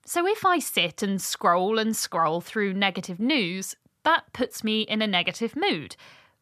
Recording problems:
none

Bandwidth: 14 kHz